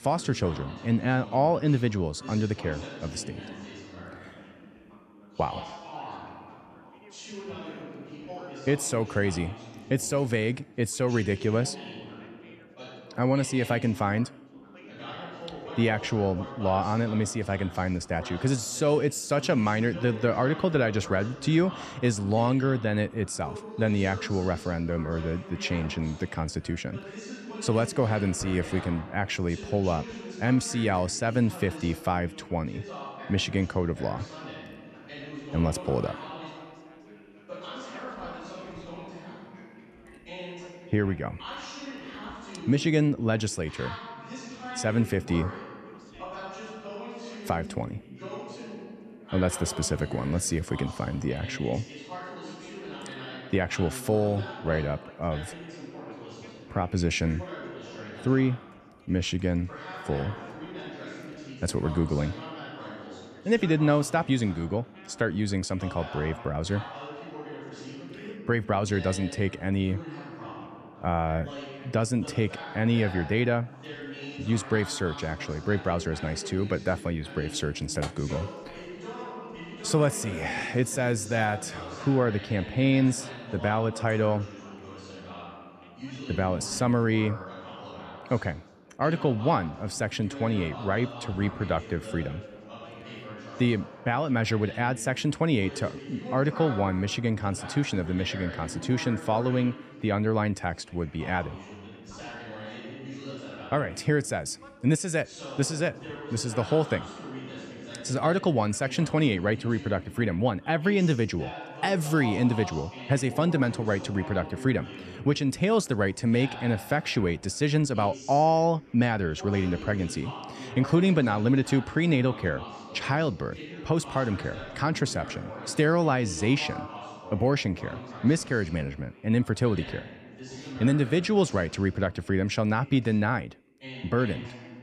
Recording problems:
background chatter; noticeable; throughout; 3 voices, 15 dB below the speech

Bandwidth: 14 kHz